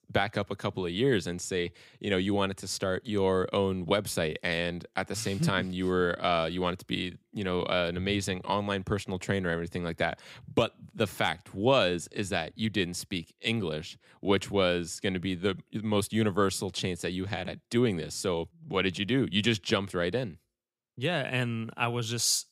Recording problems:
none

